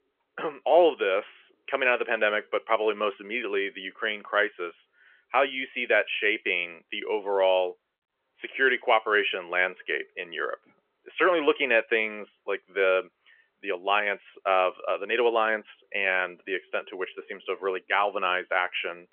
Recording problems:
phone-call audio; nothing above 3.5 kHz

